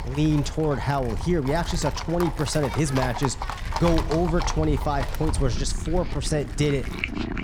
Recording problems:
animal sounds; loud; throughout; 9 dB below the speech
wind noise on the microphone; occasional gusts; 15 dB below the speech

